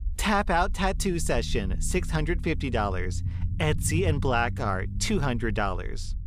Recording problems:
low rumble; noticeable; throughout; 20 dB below the speech

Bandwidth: 14.5 kHz